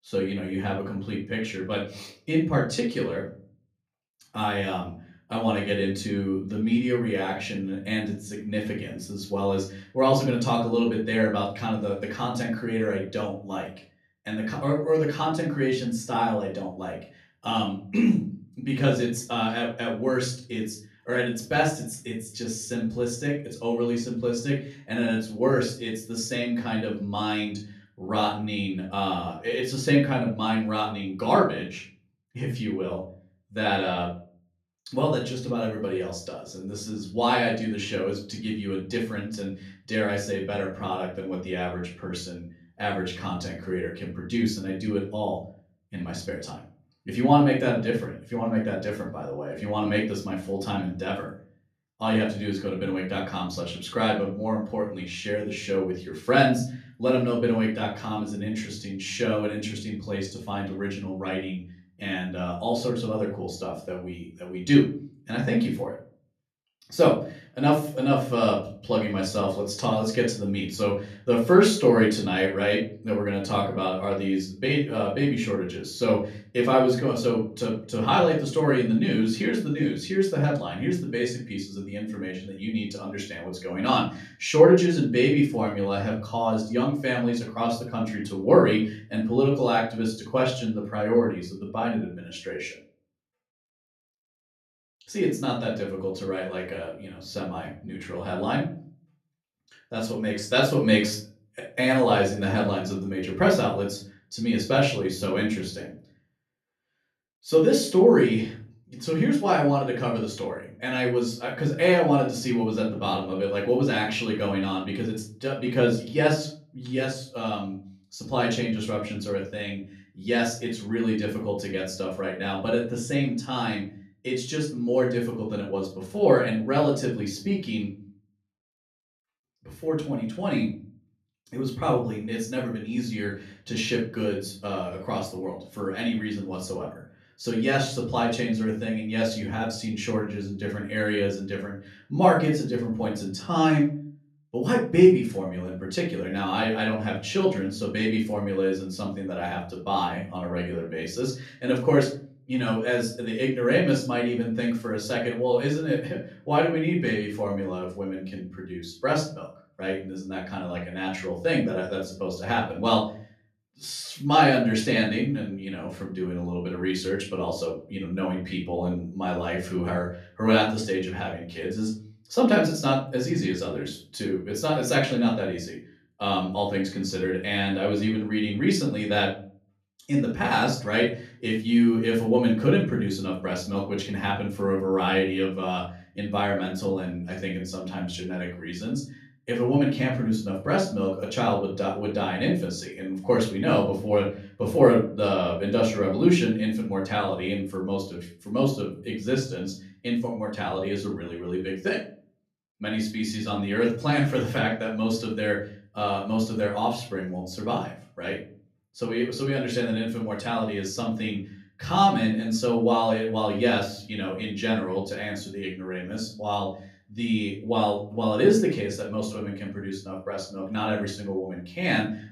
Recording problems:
off-mic speech; far
room echo; slight; dies away in 0.4 s

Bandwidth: 14.5 kHz